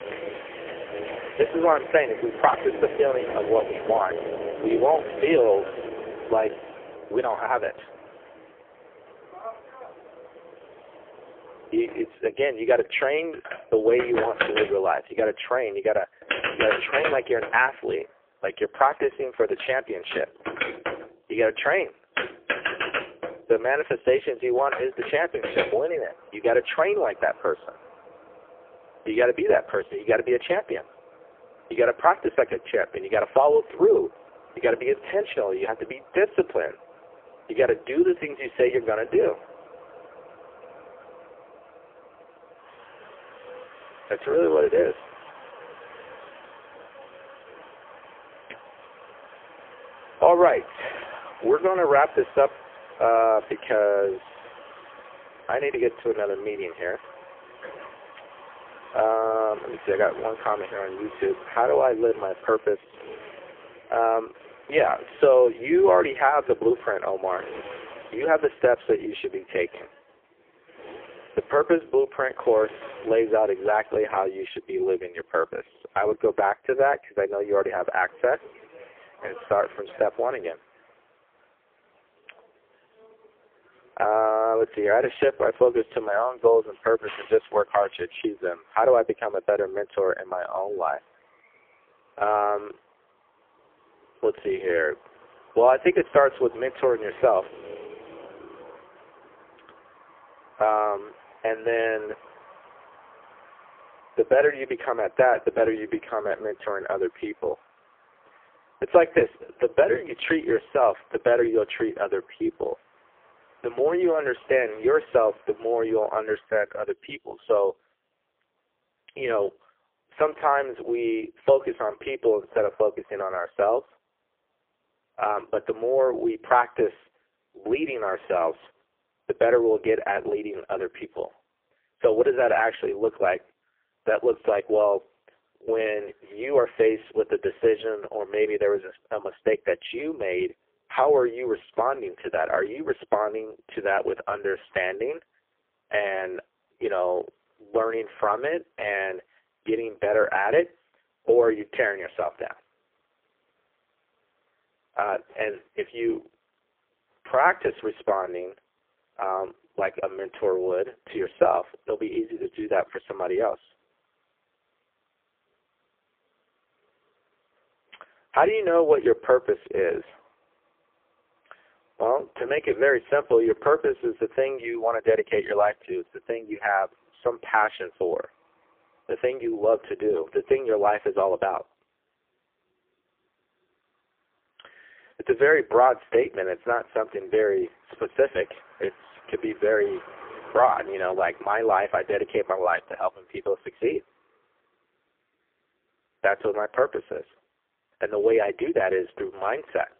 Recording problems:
phone-call audio; poor line; nothing above 3.5 kHz
traffic noise; noticeable; throughout; 15 dB below the speech

